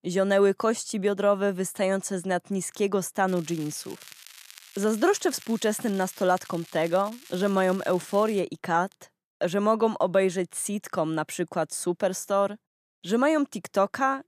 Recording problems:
crackling; faint; from 3.5 to 8.5 s; 20 dB below the speech

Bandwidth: 14.5 kHz